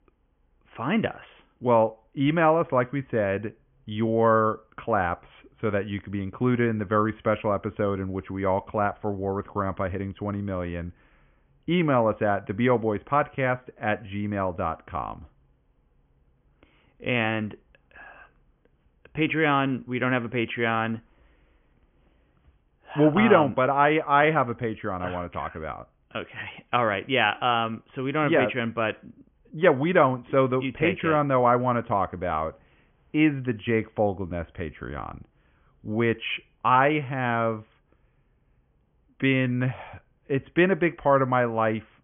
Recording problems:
high frequencies cut off; severe; nothing above 3.5 kHz

